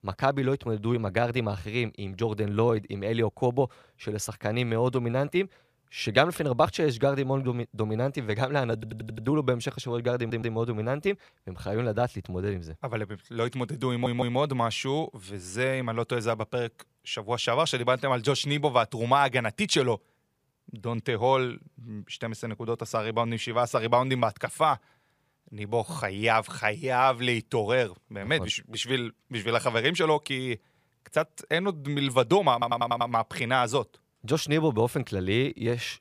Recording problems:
audio stuttering; 4 times, first at 9 s

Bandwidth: 15 kHz